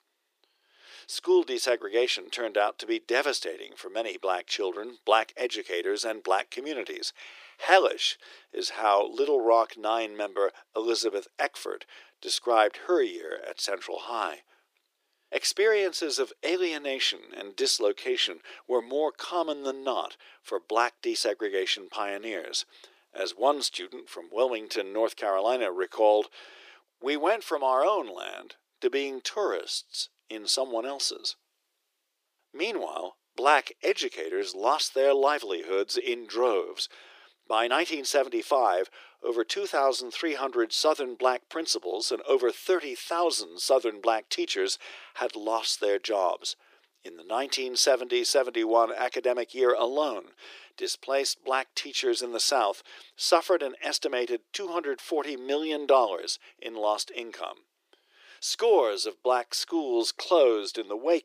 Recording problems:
thin; very; fading below 350 Hz

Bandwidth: 15 kHz